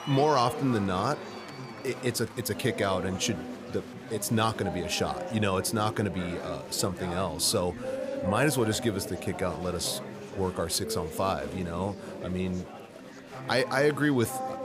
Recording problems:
chatter from many people; loud; throughout; 9 dB below the speech

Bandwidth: 15 kHz